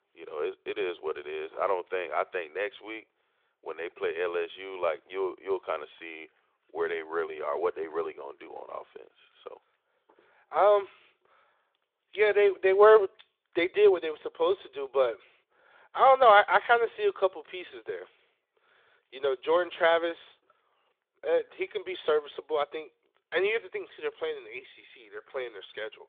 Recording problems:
phone-call audio

